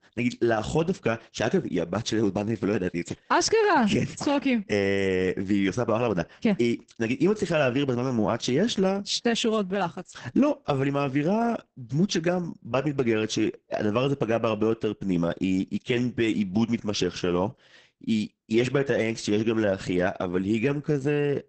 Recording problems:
garbled, watery; badly; nothing above 8 kHz

